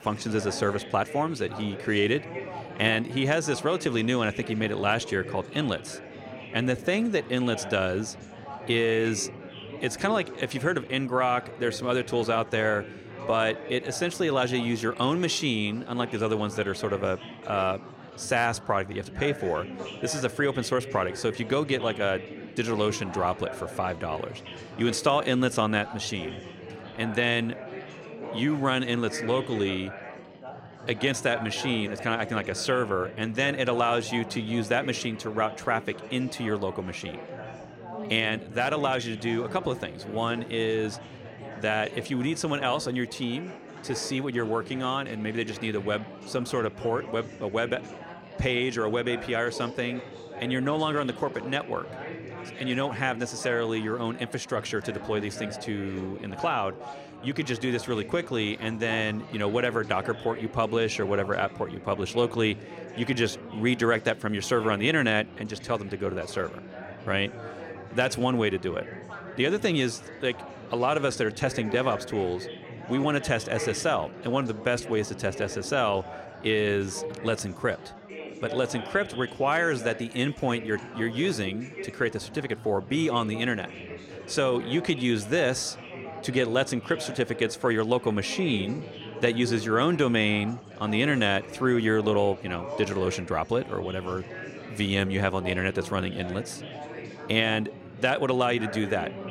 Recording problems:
chatter from many people; noticeable; throughout; 10 dB below the speech

